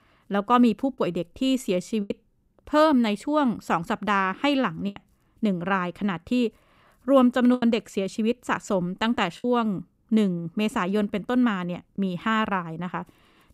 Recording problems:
choppy; occasionally; 3% of the speech affected

